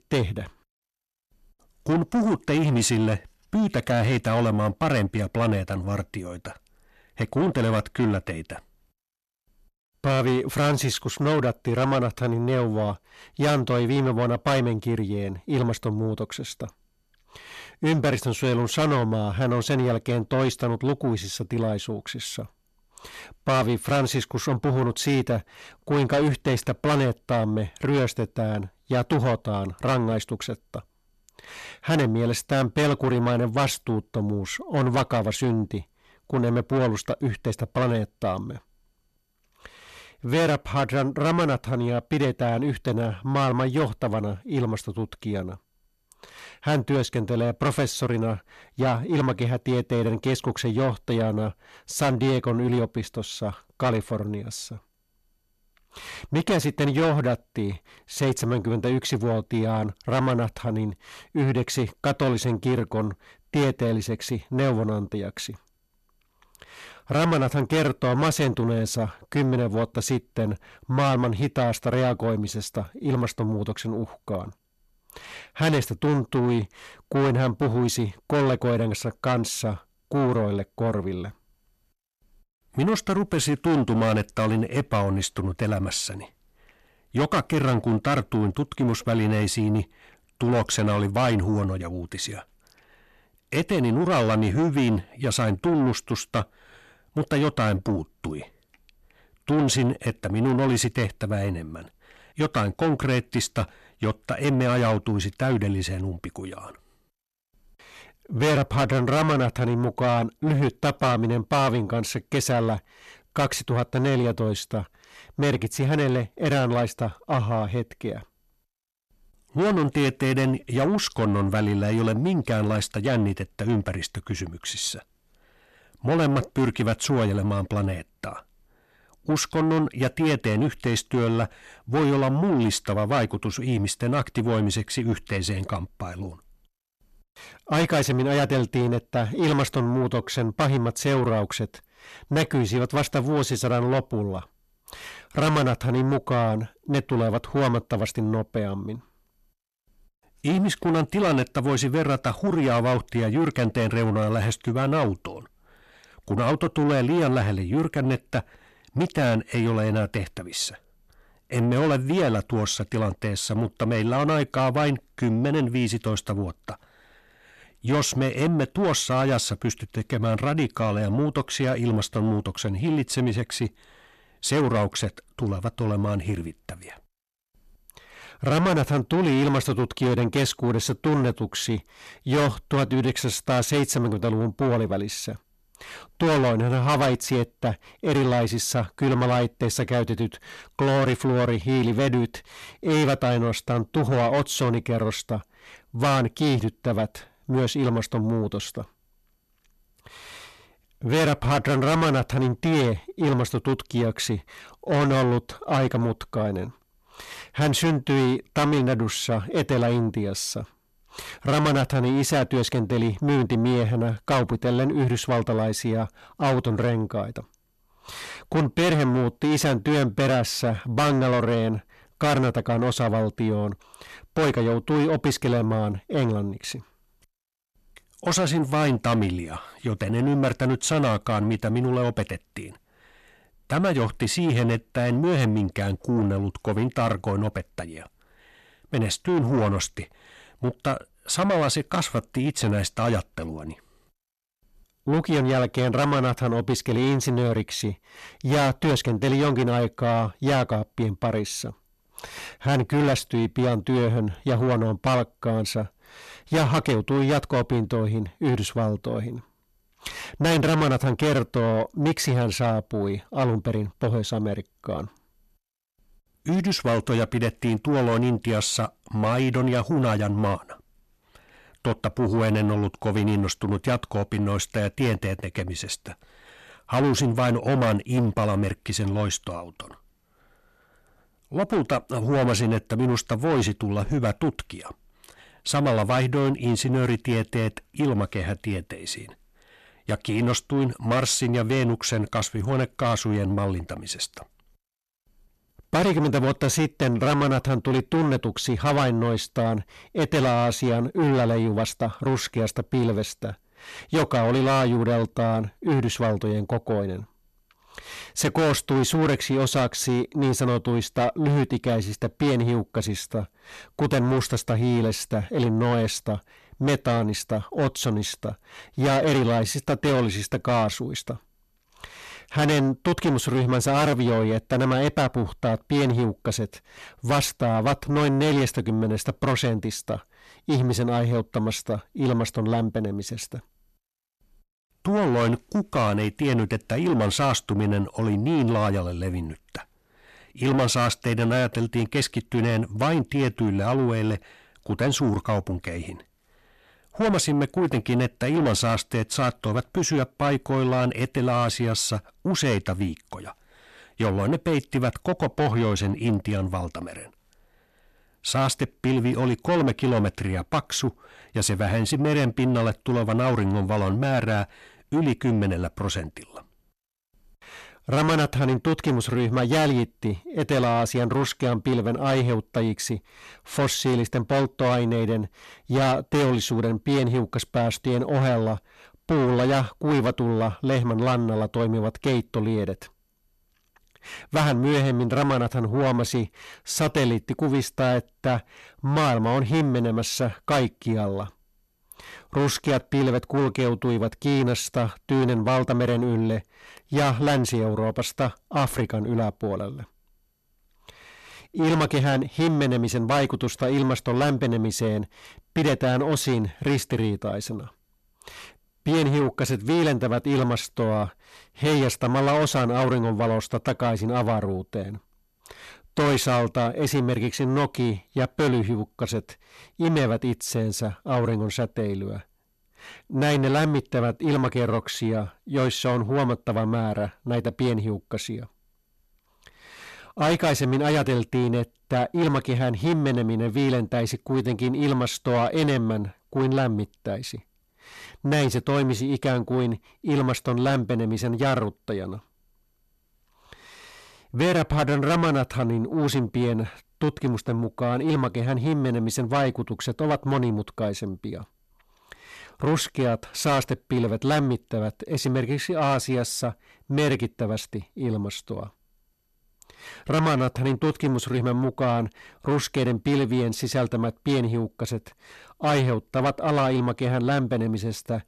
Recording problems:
distortion; heavy; 7 dB below the speech

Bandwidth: 13.5 kHz